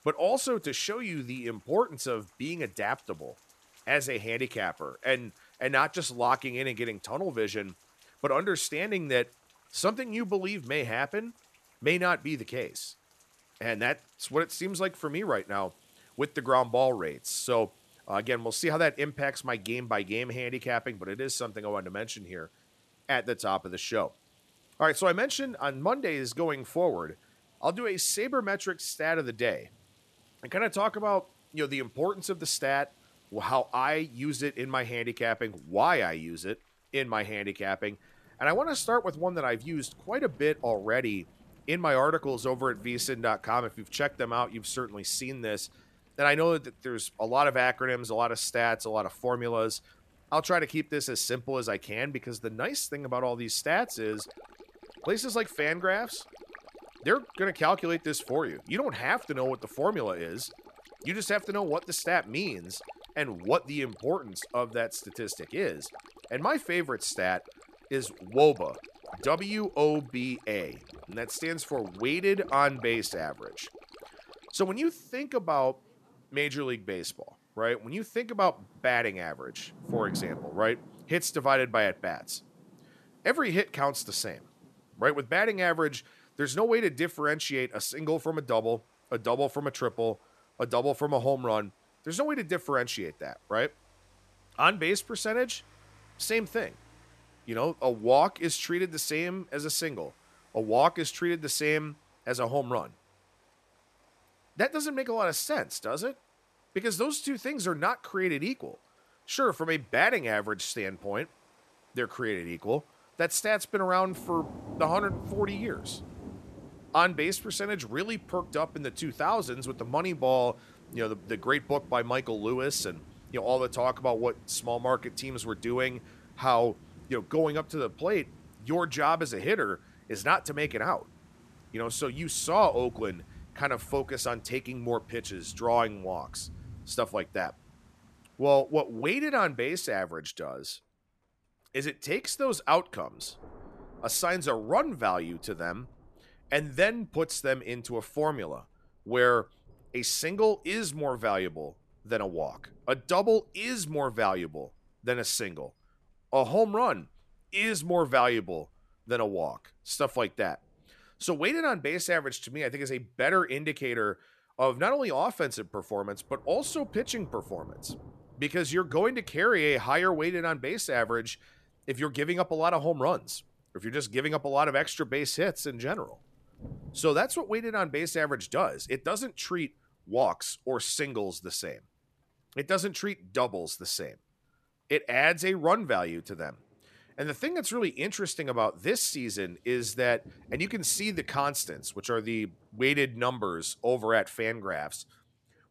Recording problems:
rain or running water; faint; throughout; 25 dB below the speech

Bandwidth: 14 kHz